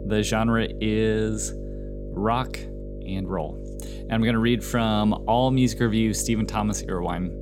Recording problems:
electrical hum; noticeable; throughout; 50 Hz, 15 dB below the speech

